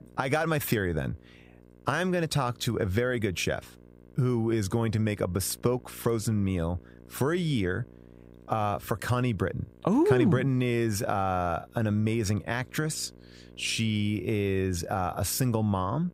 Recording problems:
electrical hum; faint; throughout; 60 Hz, 30 dB below the speech

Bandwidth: 15.5 kHz